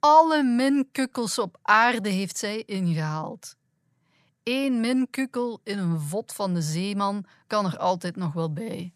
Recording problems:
none

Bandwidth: 14 kHz